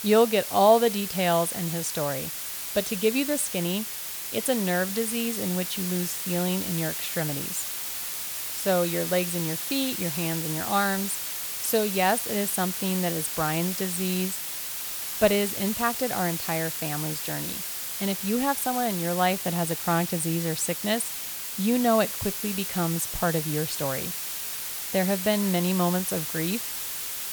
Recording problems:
hiss; loud; throughout; 3 dB below the speech

